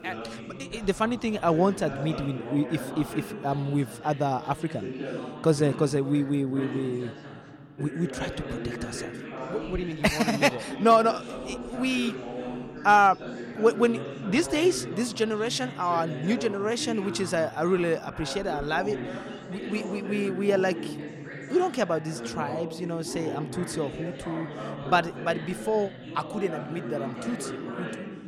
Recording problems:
background chatter; loud; throughout; 3 voices, 10 dB below the speech

